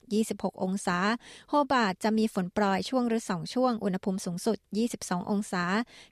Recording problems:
none

